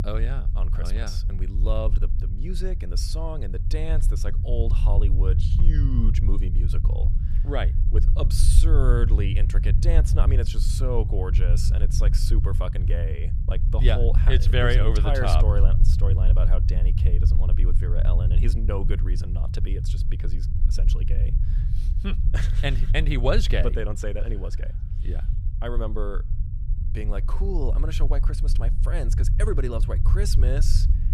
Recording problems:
low rumble; loud; throughout; 9 dB below the speech

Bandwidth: 14 kHz